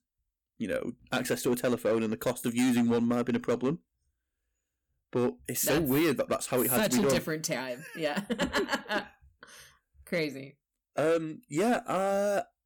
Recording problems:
distortion; slight; 7% of the sound clipped

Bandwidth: 18.5 kHz